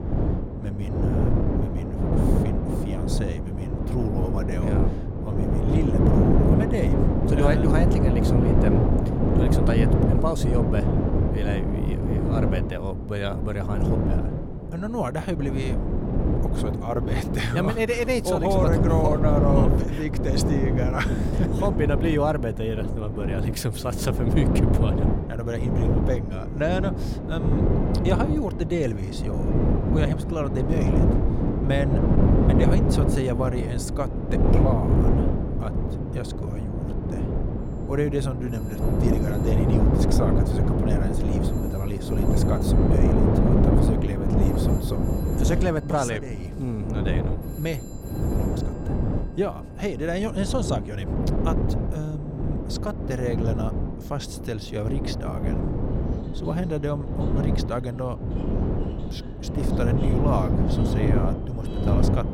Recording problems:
wind noise on the microphone; heavy; as loud as the speech
alarms or sirens; faint; throughout; 25 dB below the speech

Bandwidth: 16.5 kHz